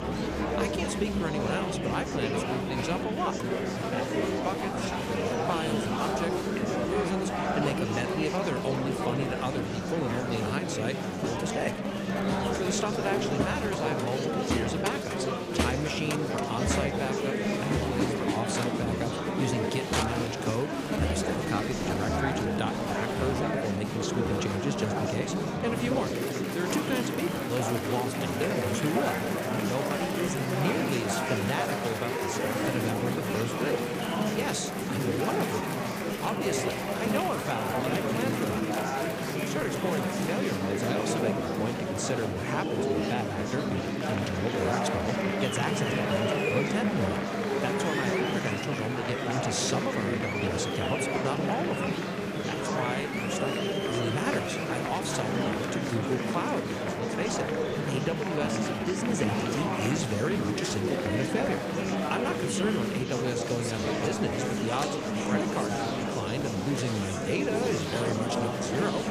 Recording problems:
murmuring crowd; very loud; throughout; 3 dB above the speech

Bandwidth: 15 kHz